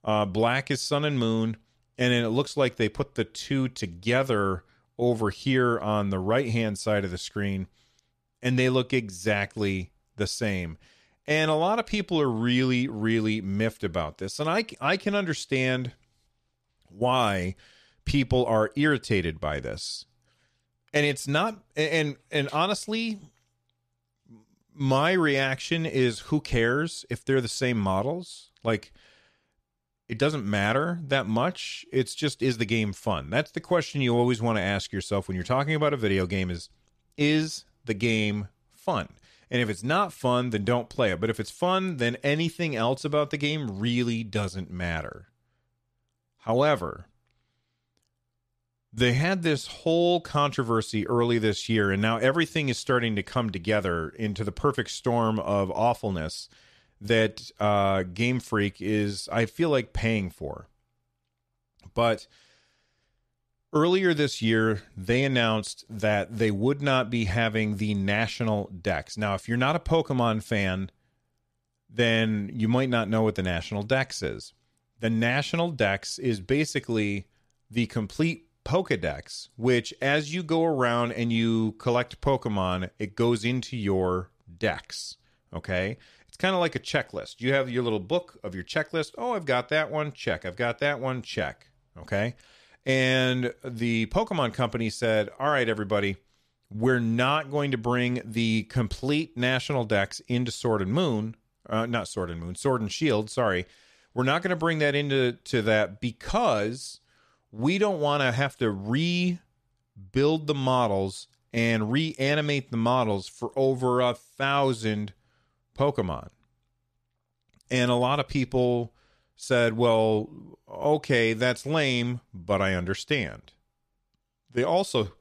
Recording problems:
none

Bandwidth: 14.5 kHz